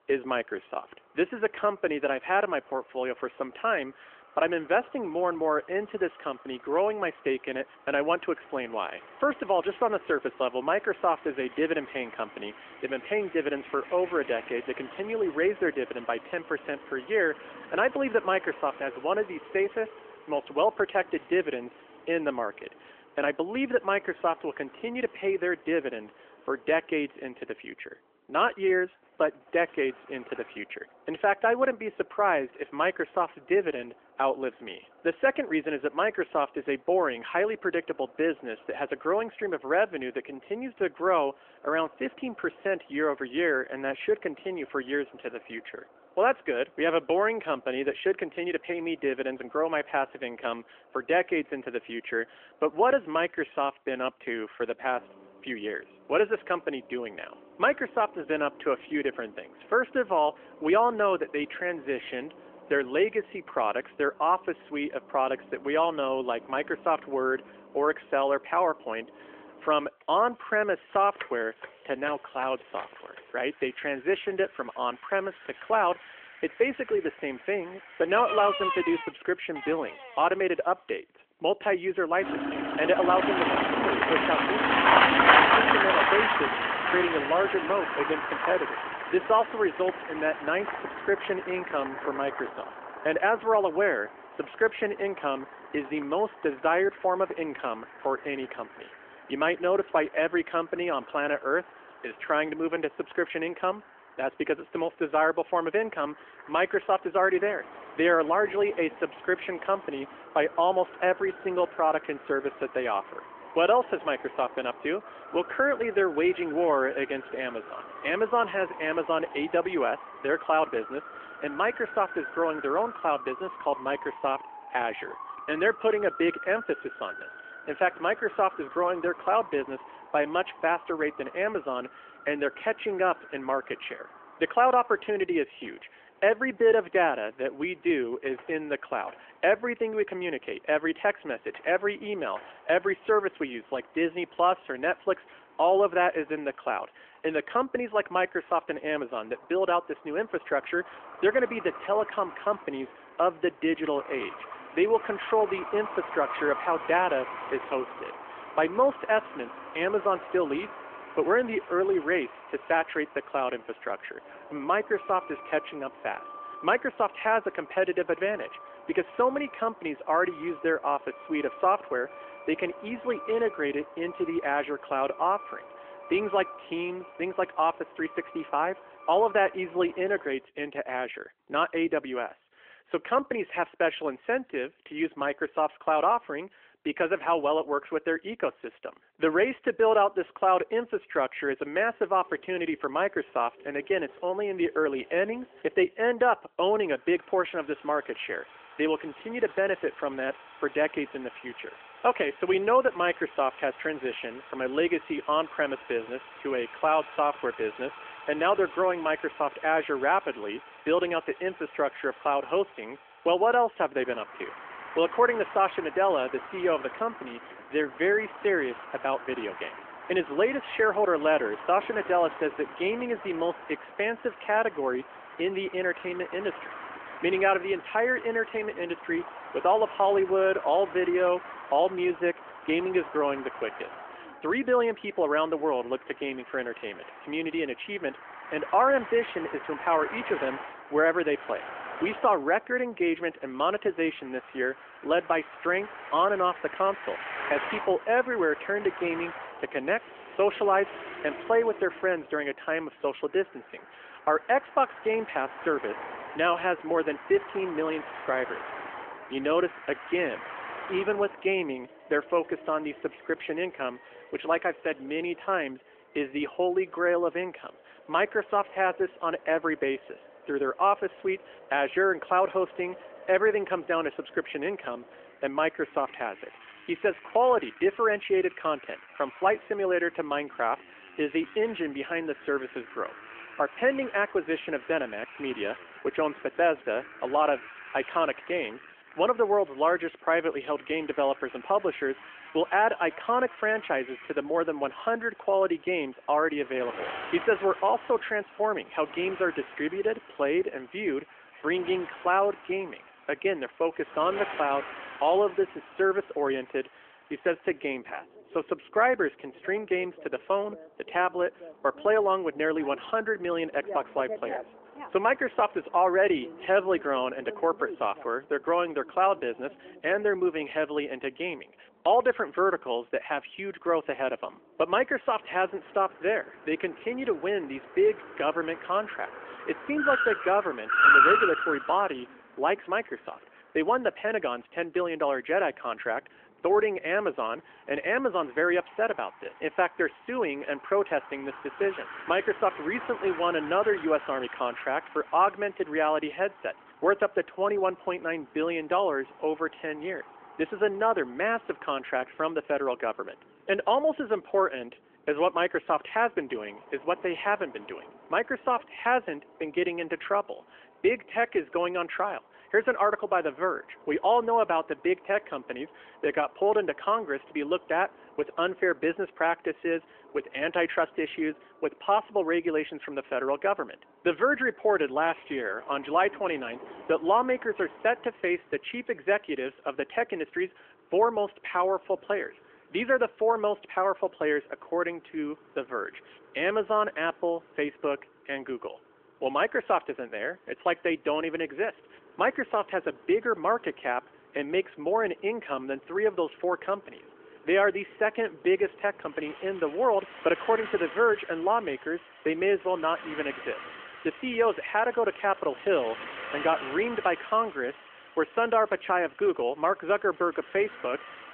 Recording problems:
phone-call audio; nothing above 3 kHz
traffic noise; loud; throughout; 7 dB below the speech

